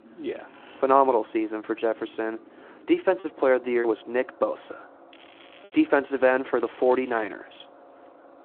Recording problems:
muffled; very; fading above 2.5 kHz
phone-call audio
traffic noise; faint; throughout; 25 dB below the speech
crackling; faint; at 5 s and at 6.5 s; 25 dB below the speech
choppy; very; from 3 to 5.5 s; 5% of the speech affected

